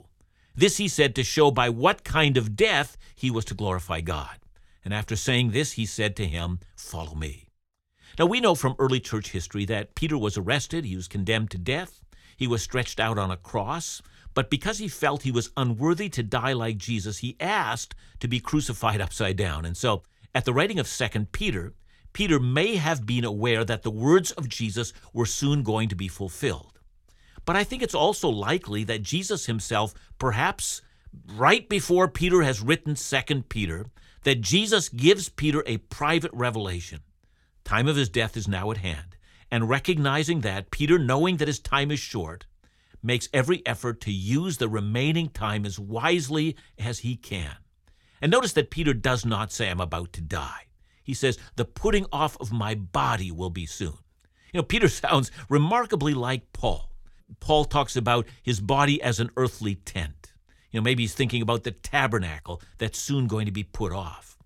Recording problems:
none

